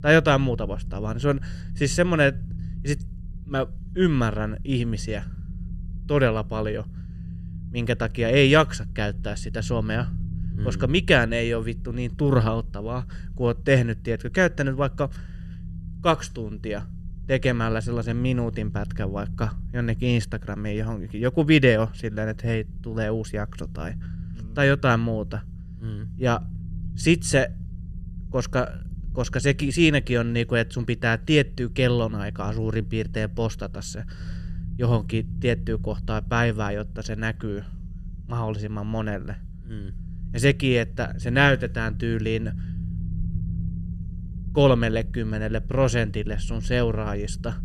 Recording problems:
low rumble; faint; throughout; 20 dB below the speech

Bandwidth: 13.5 kHz